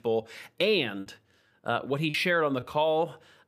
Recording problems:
choppy; very; from 1 to 2 s; 12% of the speech affected

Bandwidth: 15 kHz